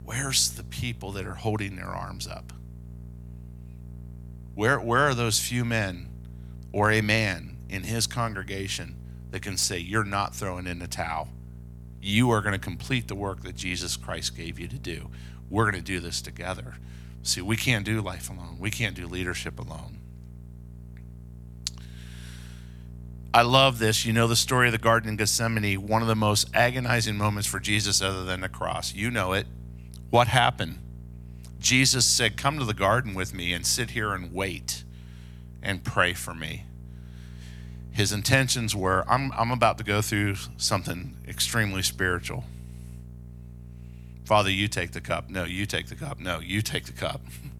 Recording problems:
electrical hum; faint; throughout; 60 Hz, 30 dB below the speech

